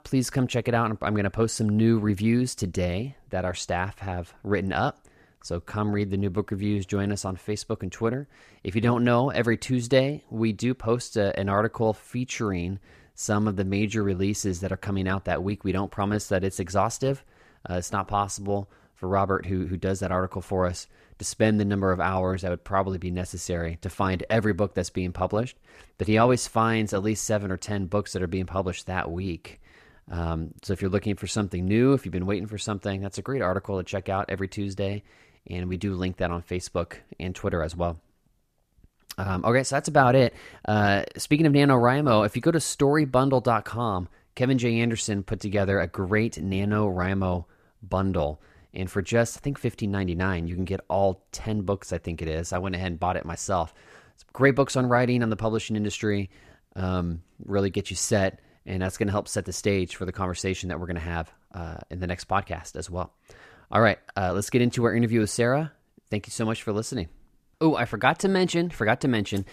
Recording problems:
none

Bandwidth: 14.5 kHz